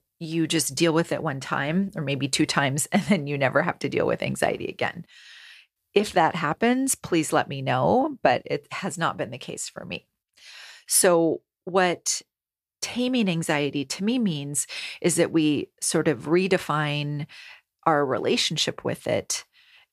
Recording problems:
none

